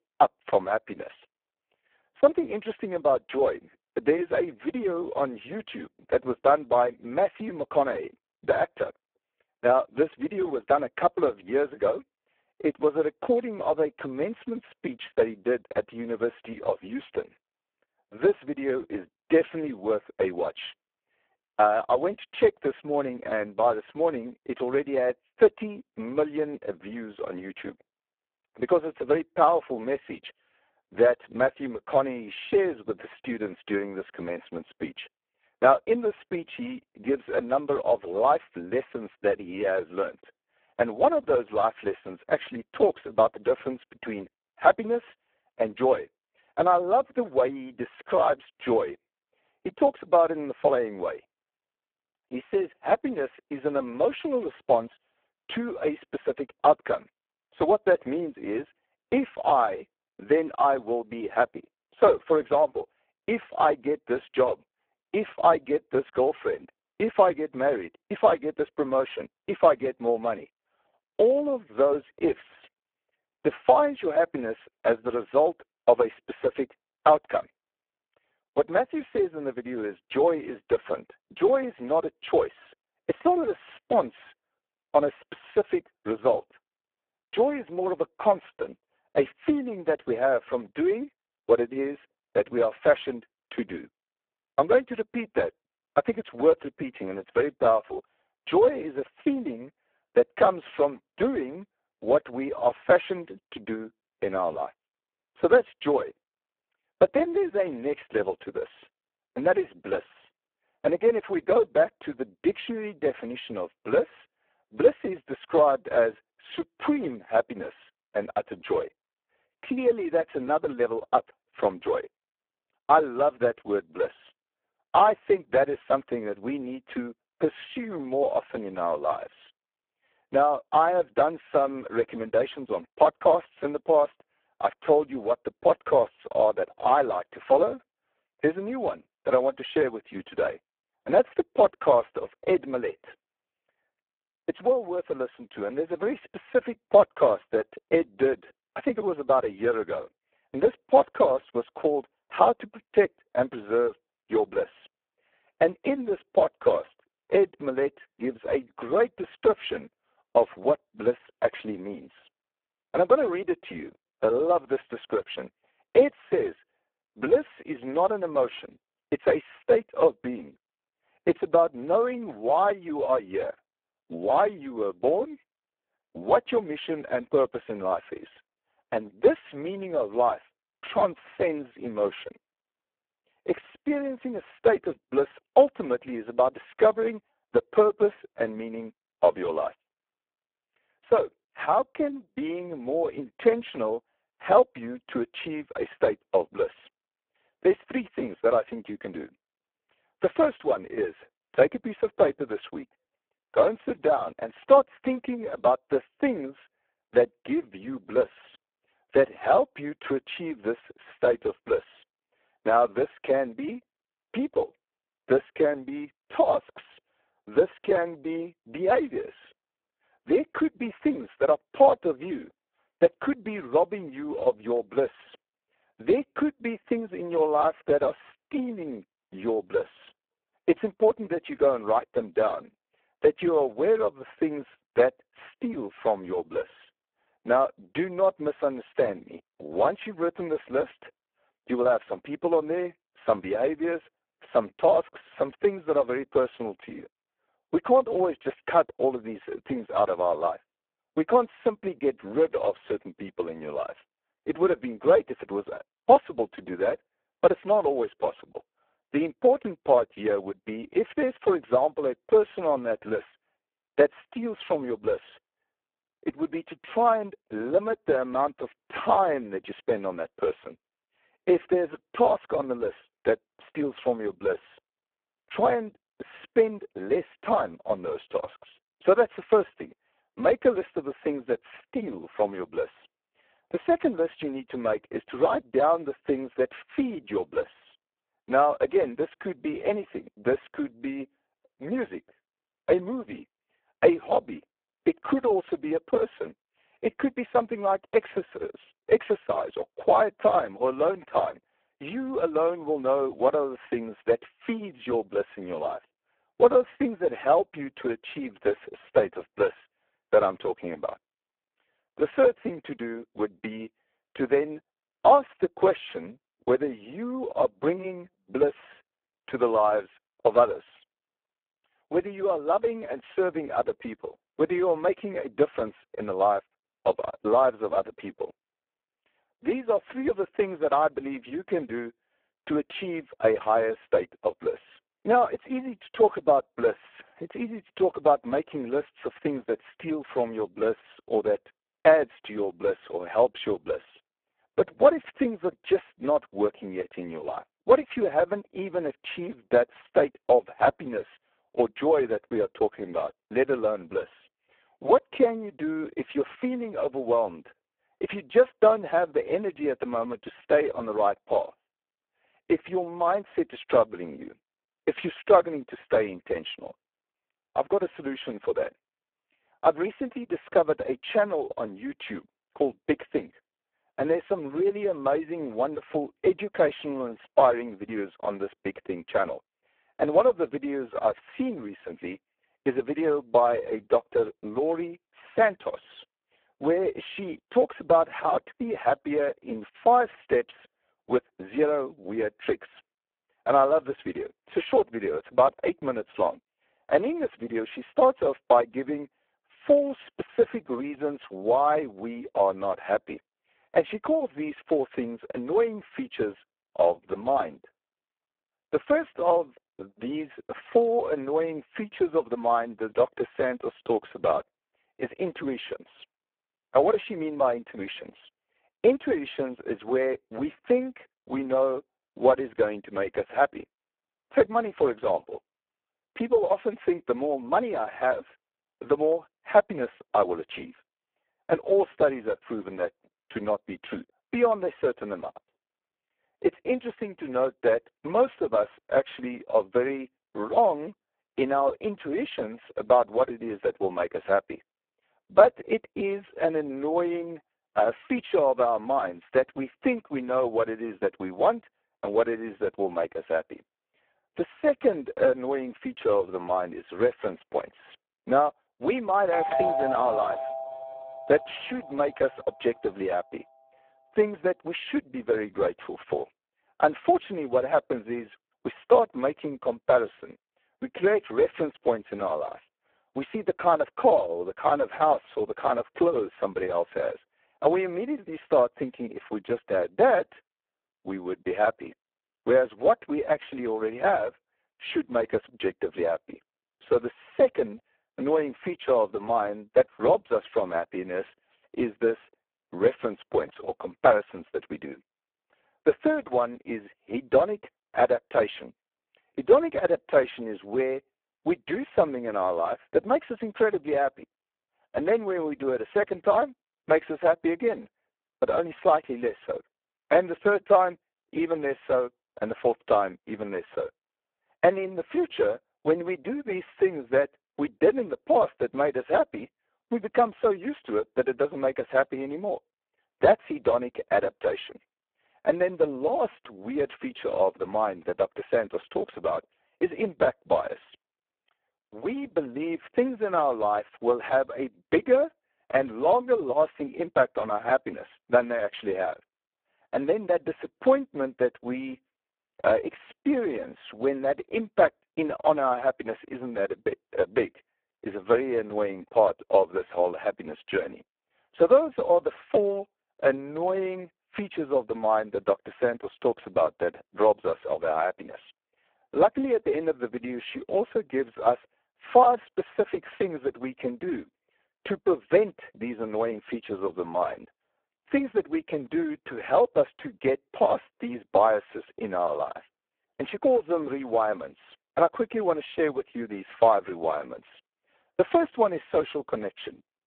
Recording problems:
phone-call audio; poor line
doorbell; noticeable; from 7:40 to 7:42; peak level with the speech

